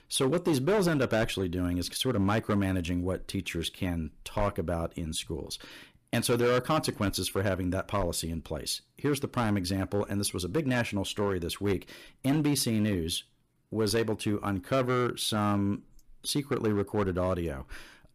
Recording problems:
distortion; slight; 6% of the sound clipped

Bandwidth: 15 kHz